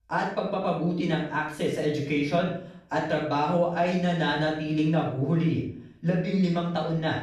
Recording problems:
off-mic speech; far
room echo; noticeable; dies away in 0.5 s

